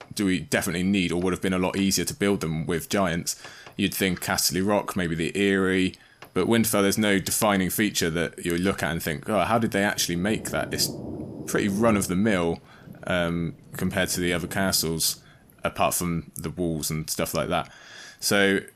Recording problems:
rain or running water; noticeable; throughout; 15 dB below the speech

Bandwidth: 14.5 kHz